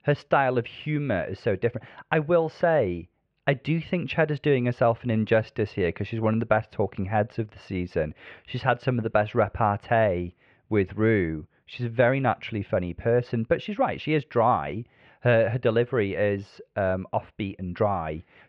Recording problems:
muffled; very; fading above 2.5 kHz

